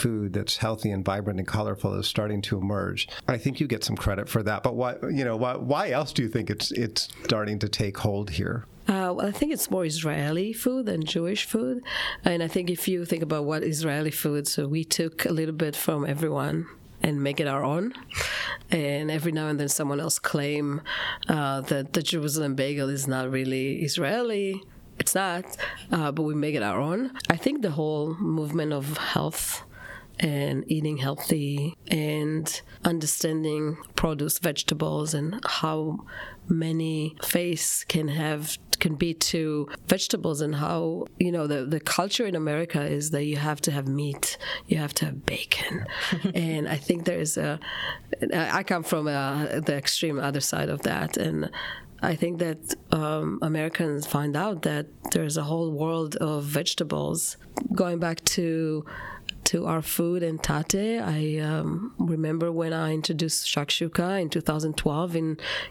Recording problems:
squashed, flat; heavily

